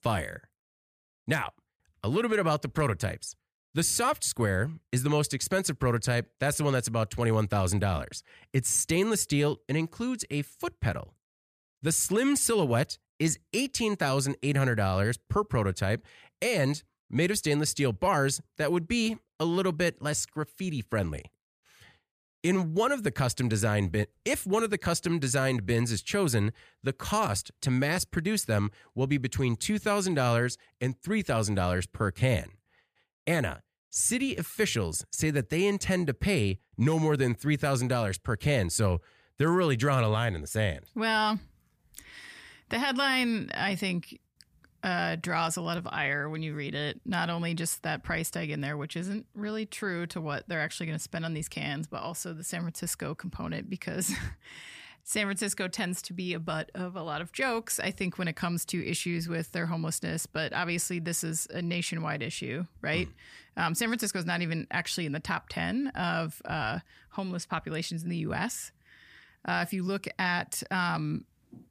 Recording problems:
none

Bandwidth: 15 kHz